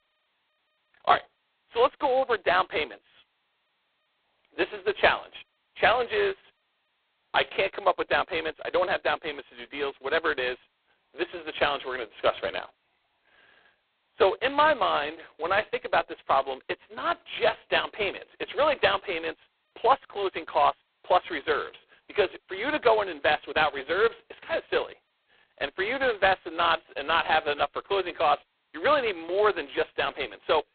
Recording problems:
phone-call audio; poor line; nothing above 4 kHz

